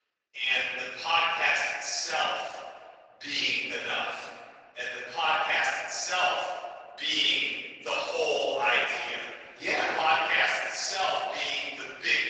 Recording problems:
room echo; strong; dies away in 1.8 s
off-mic speech; far
thin; very; fading below 800 Hz
garbled, watery; slightly

